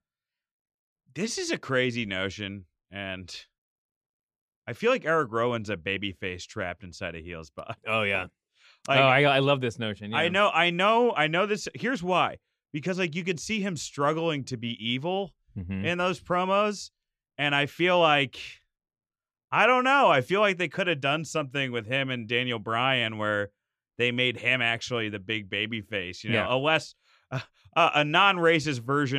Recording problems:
abrupt cut into speech; at the end

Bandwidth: 15 kHz